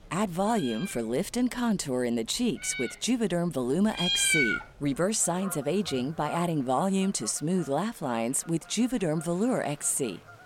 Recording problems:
animal sounds; loud; throughout; 3 dB below the speech
murmuring crowd; faint; throughout; 30 dB below the speech

